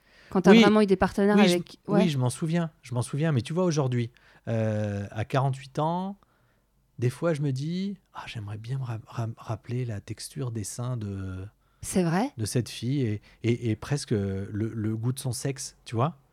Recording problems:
none

